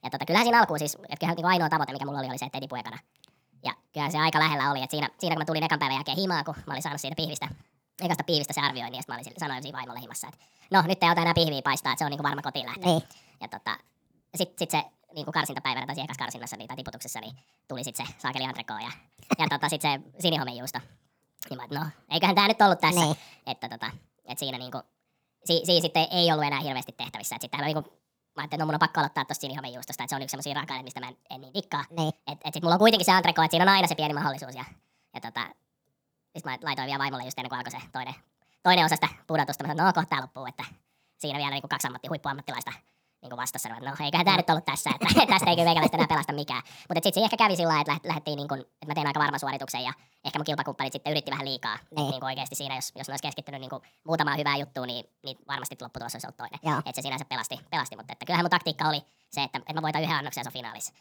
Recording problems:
wrong speed and pitch; too fast and too high; 1.6 times normal speed

